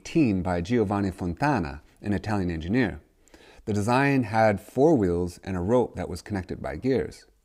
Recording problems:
none

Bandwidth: 15.5 kHz